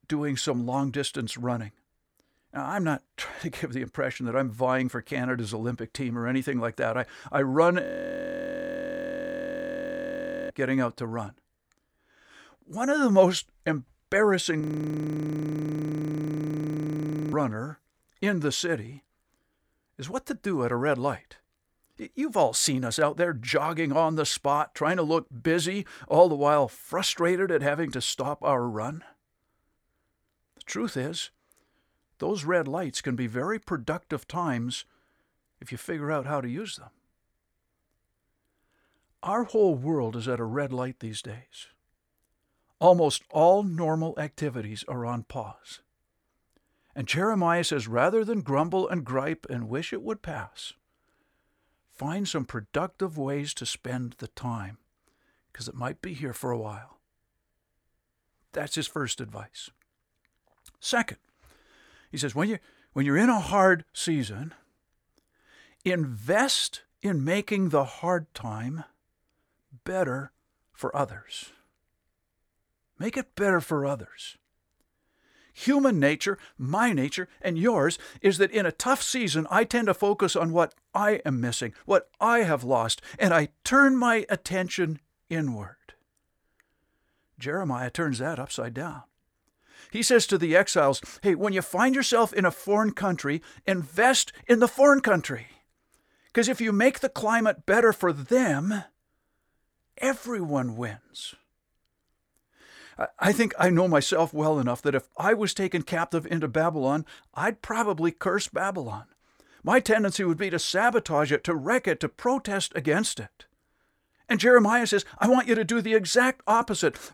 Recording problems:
audio freezing; at 8 s for 2.5 s and at 15 s for 2.5 s

